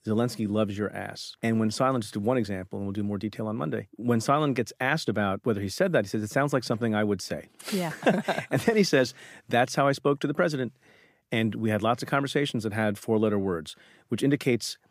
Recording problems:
none

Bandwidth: 15 kHz